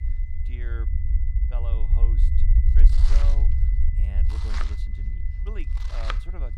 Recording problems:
household noises; very loud; throughout; 5 dB above the speech
high-pitched whine; loud; throughout; 2 kHz, 7 dB below the speech
low rumble; loud; throughout; 1 dB below the speech

